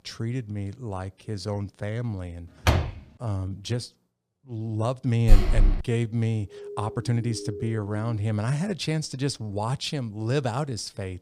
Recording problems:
uneven, jittery; strongly; from 1.5 to 10 s
door banging; loud; at 2.5 s and at 5.5 s; peak 6 dB above the speech
siren; noticeable; from 6.5 to 8 s; peak 8 dB below the speech

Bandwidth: 15 kHz